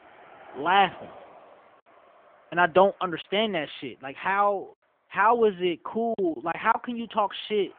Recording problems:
phone-call audio
traffic noise; faint; throughout; 25 dB below the speech
choppy; occasionally; 2% of the speech affected

